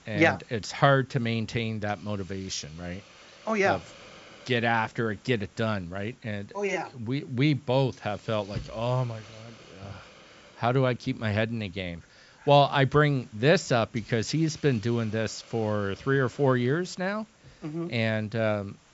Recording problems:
high frequencies cut off; noticeable; nothing above 8 kHz
hiss; faint; throughout; 25 dB below the speech

